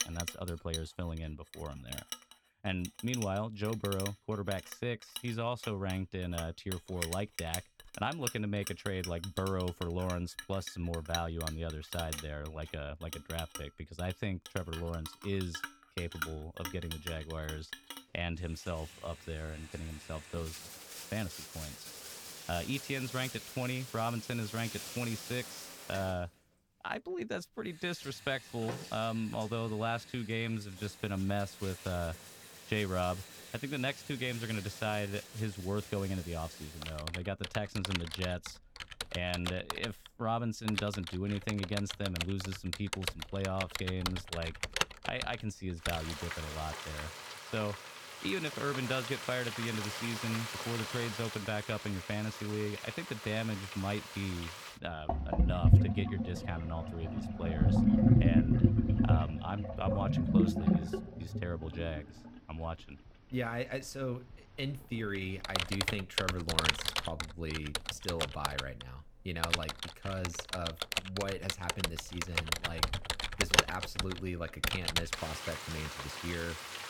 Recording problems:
household noises; very loud; throughout; 2 dB above the speech

